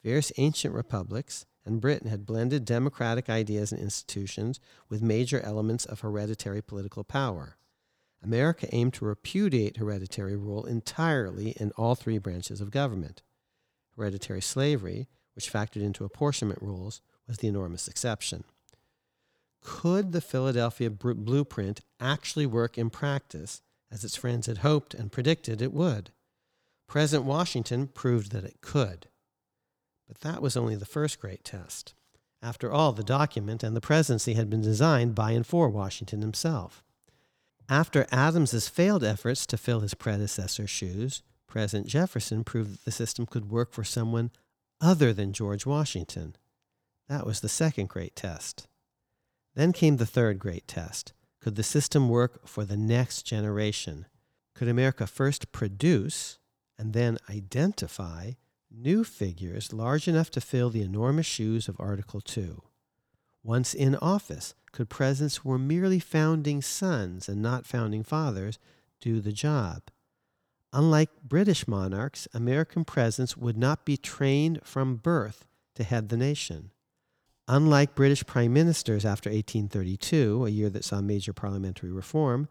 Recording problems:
none

